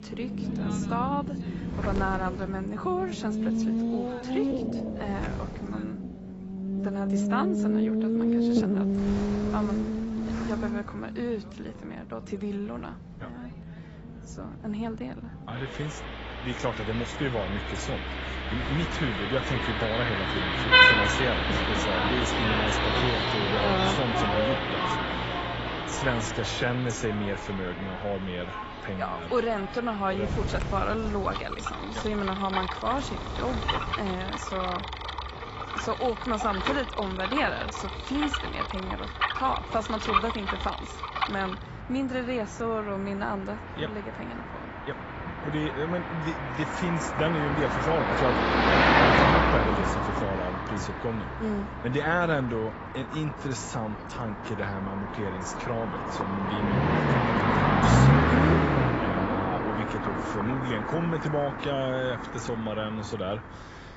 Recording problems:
garbled, watery; badly; nothing above 7.5 kHz
traffic noise; very loud; throughout; 4 dB above the speech
wind noise on the microphone; occasional gusts; 15 dB below the speech

